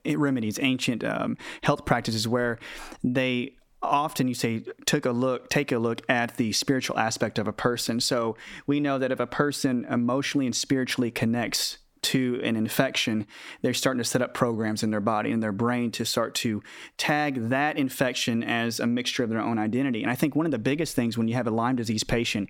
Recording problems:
squashed, flat; heavily

